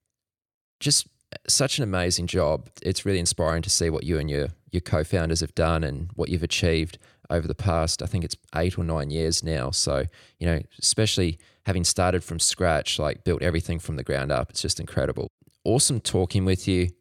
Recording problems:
none

